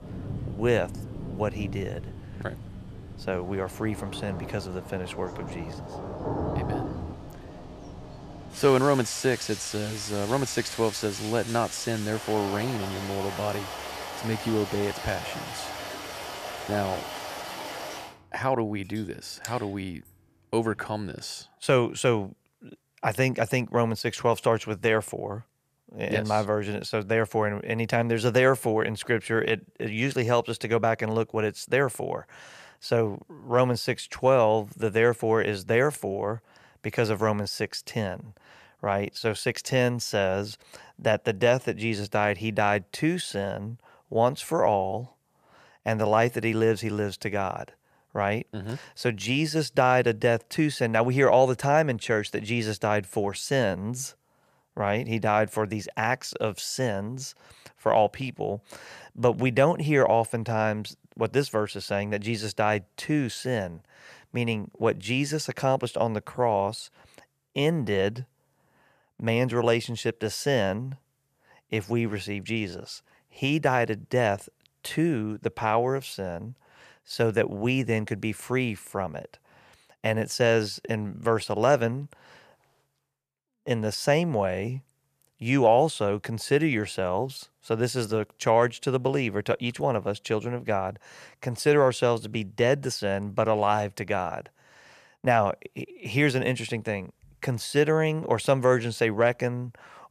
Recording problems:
rain or running water; noticeable; until 20 s; 10 dB below the speech

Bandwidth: 14.5 kHz